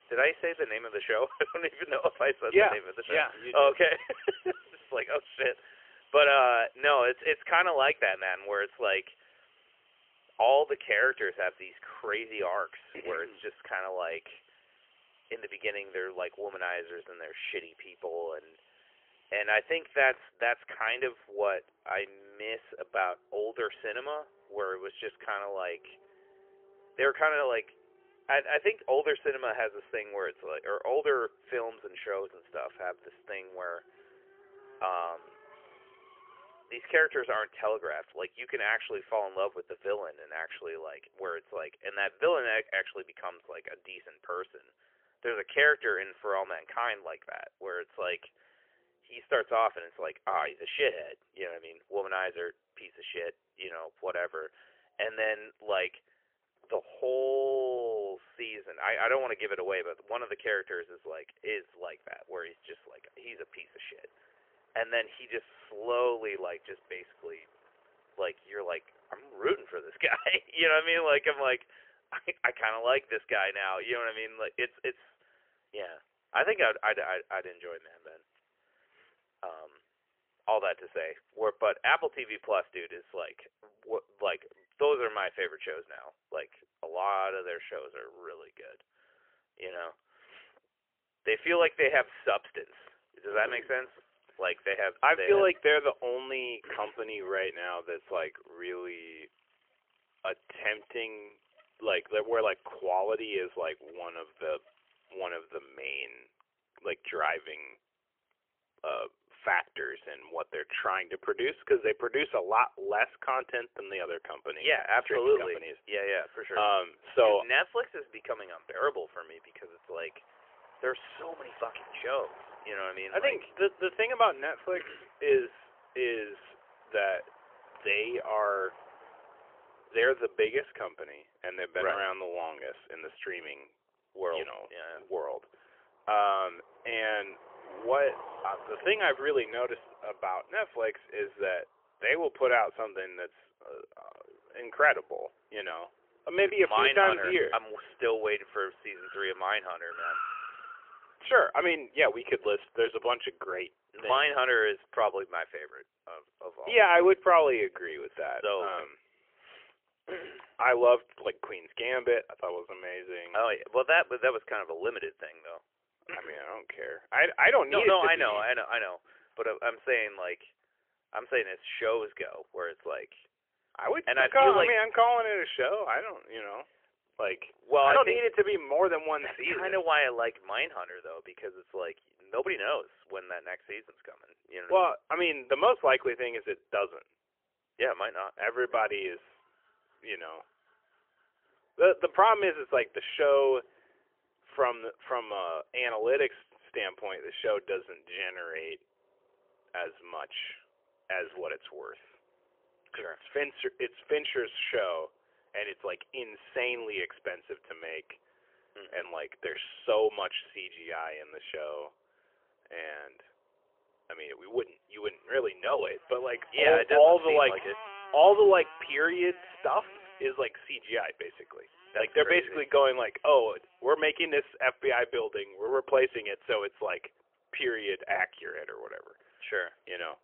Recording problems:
phone-call audio; poor line; nothing above 3 kHz
traffic noise; faint; throughout; 25 dB below the speech

